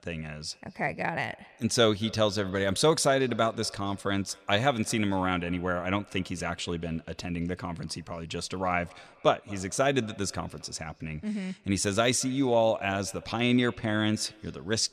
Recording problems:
echo of what is said; faint; throughout; 220 ms later, 25 dB below the speech

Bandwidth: 14 kHz